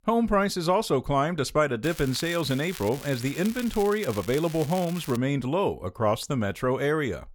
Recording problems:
crackling; noticeable; from 2 to 5 s; 15 dB below the speech

